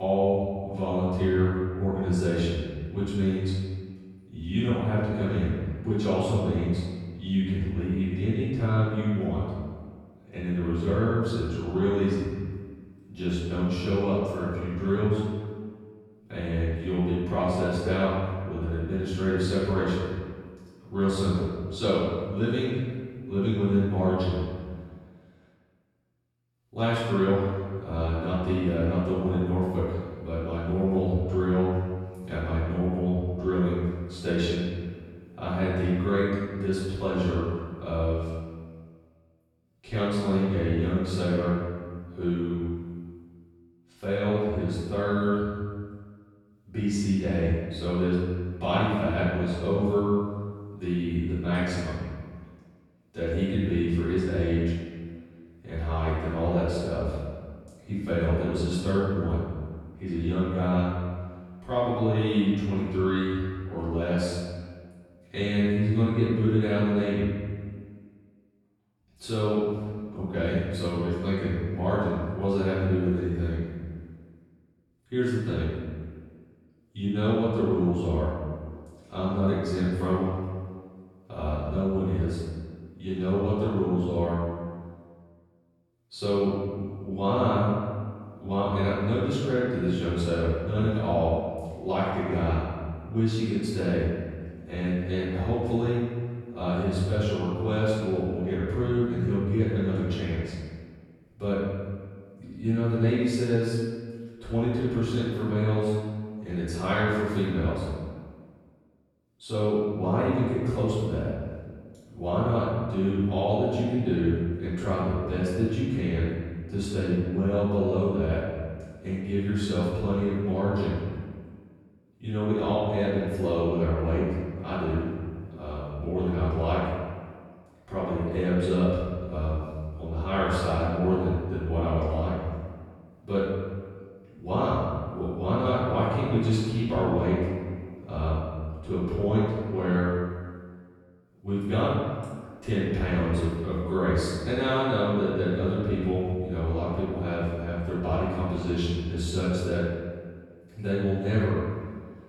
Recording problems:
room echo; strong; dies away in 1.6 s
off-mic speech; far
abrupt cut into speech; at the start

